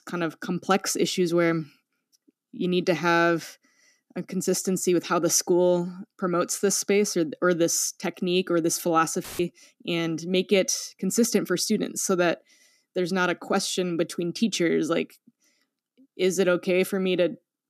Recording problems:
audio cutting out; filled with static; at 9 s

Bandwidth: 14.5 kHz